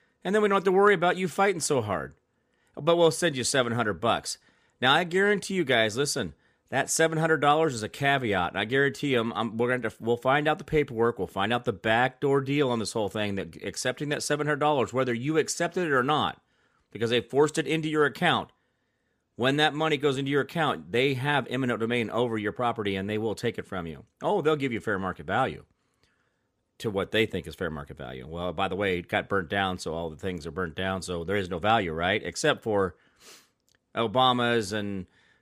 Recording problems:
none

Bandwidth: 15 kHz